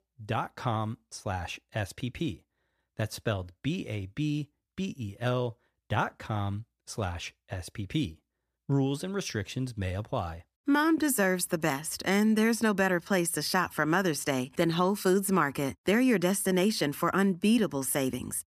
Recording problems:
none

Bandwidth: 14.5 kHz